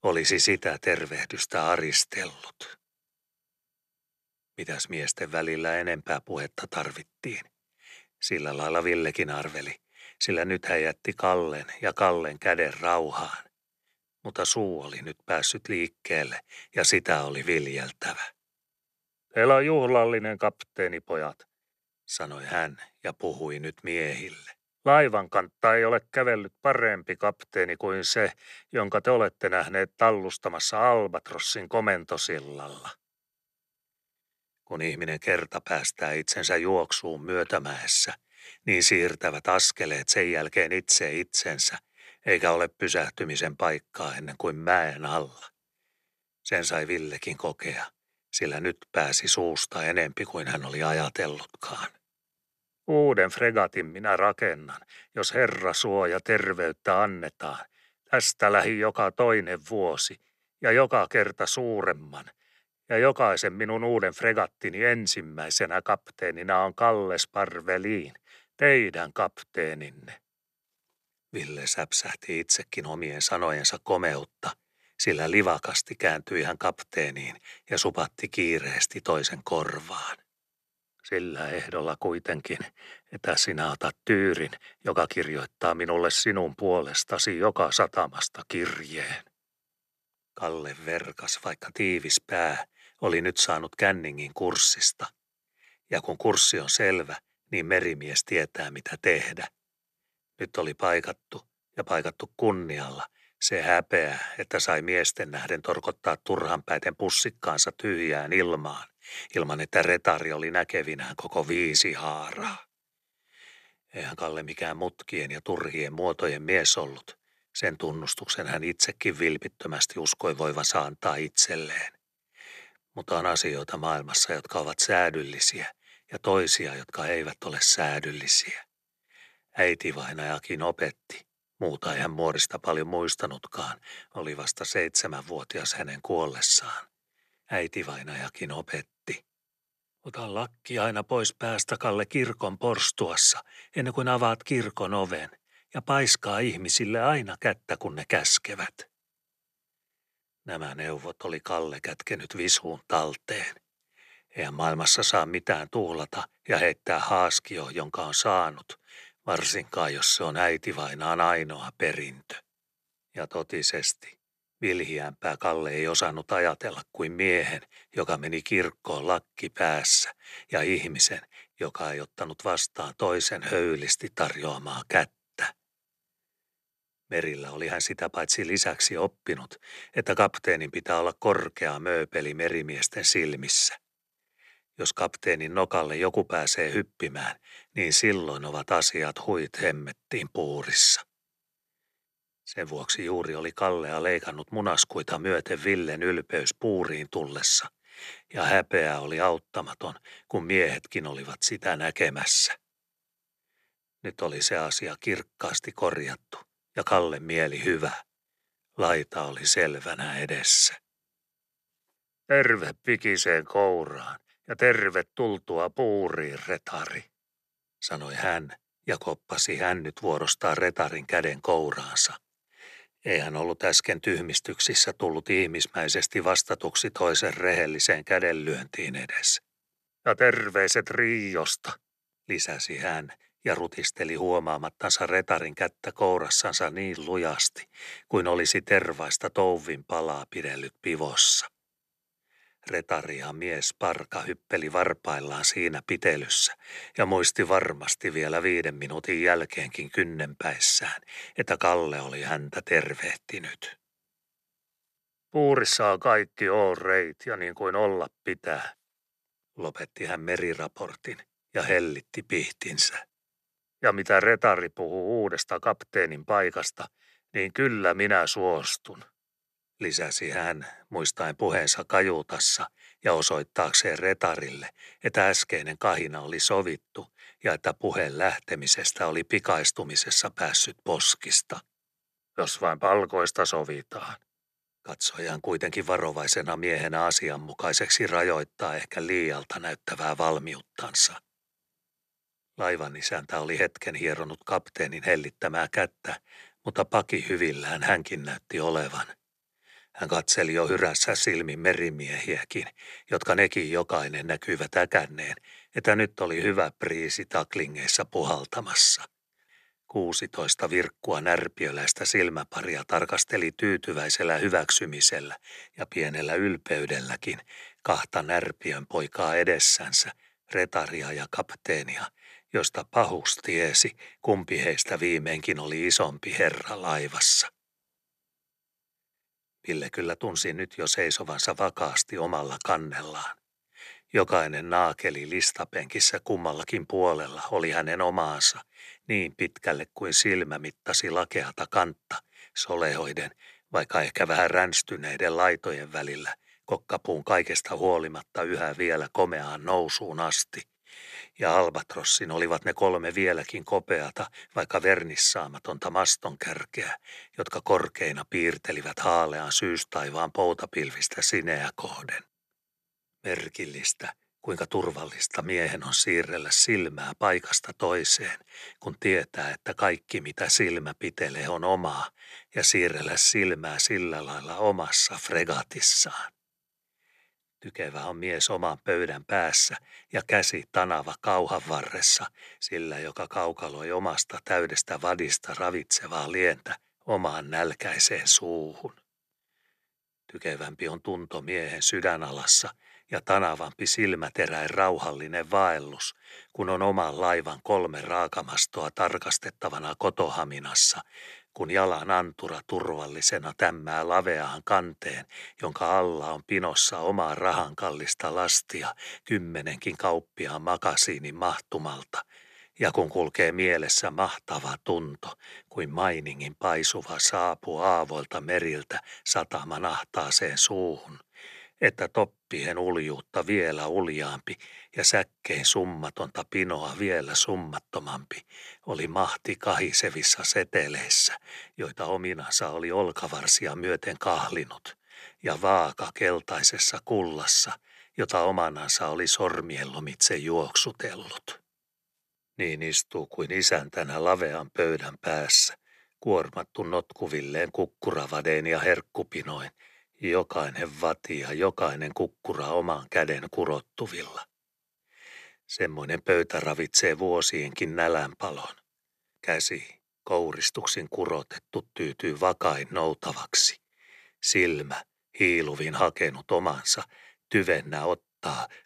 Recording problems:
none

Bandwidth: 13.5 kHz